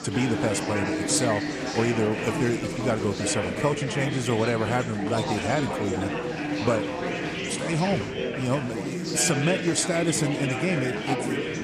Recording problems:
chatter from many people; loud; throughout; 2 dB below the speech

